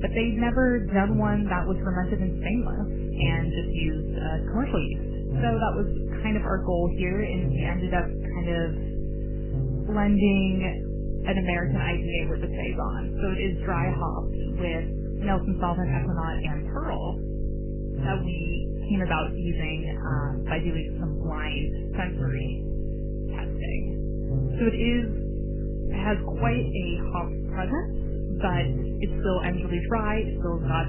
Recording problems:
garbled, watery; badly; nothing above 3 kHz
electrical hum; loud; throughout; 50 Hz, 8 dB below the speech

